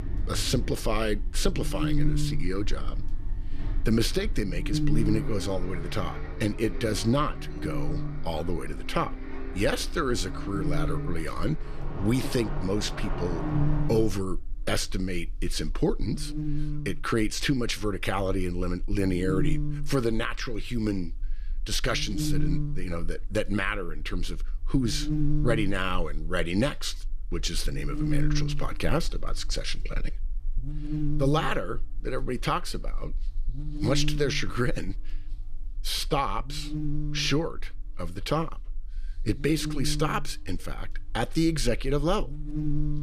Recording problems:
electrical hum; loud; throughout; 50 Hz, 8 dB below the speech
traffic noise; loud; until 14 s; 10 dB below the speech

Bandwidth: 14 kHz